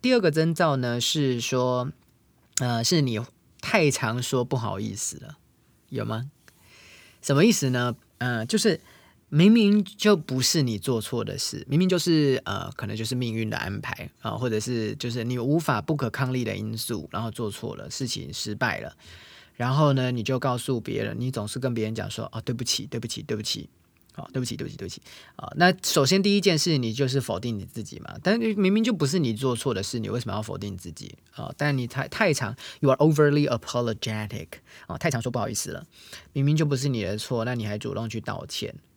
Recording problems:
uneven, jittery; strongly; from 2.5 to 37 s

